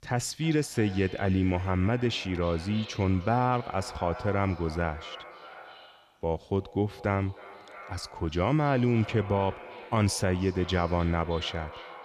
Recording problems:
echo of what is said; noticeable; throughout; 310 ms later, 15 dB below the speech

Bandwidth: 14.5 kHz